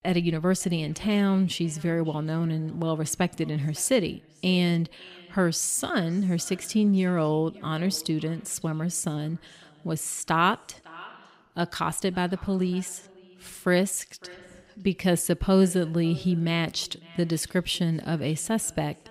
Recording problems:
echo of what is said; faint; throughout; 550 ms later, 25 dB below the speech

